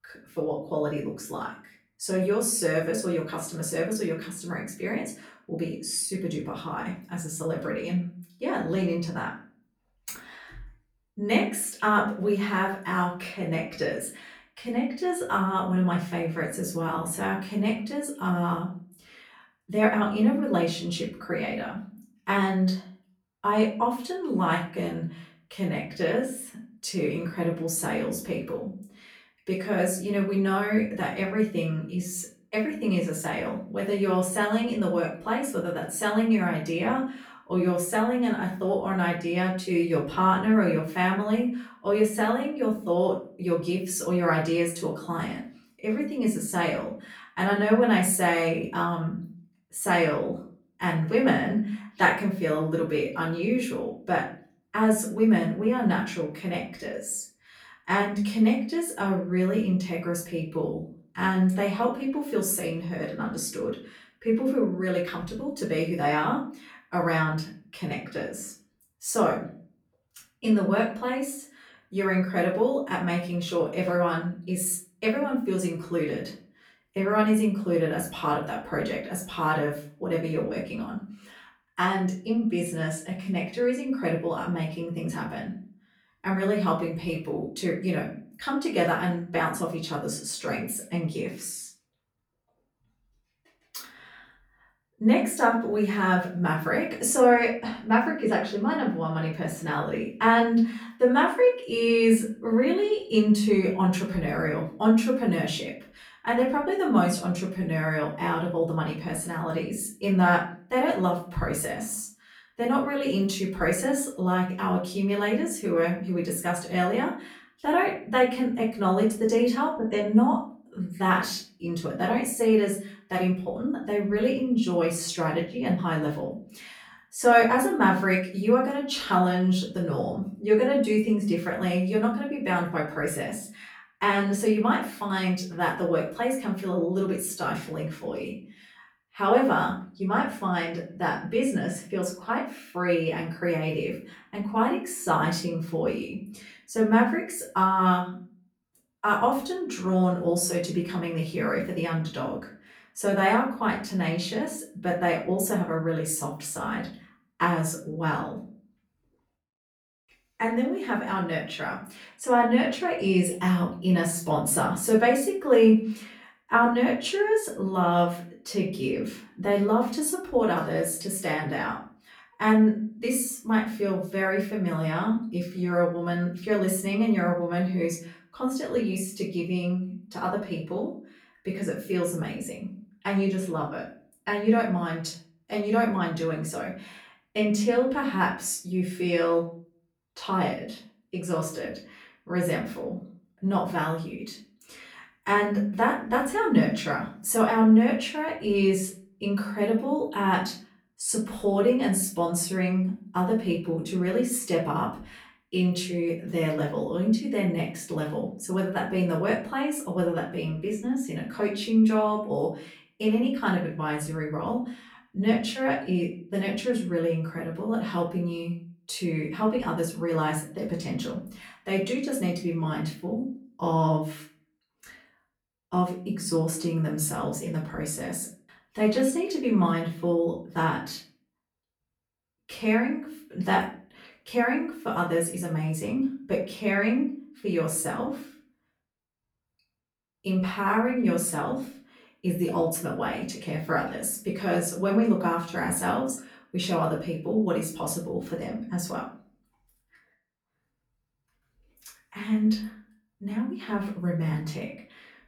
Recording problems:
off-mic speech; far
room echo; slight; dies away in 0.4 s

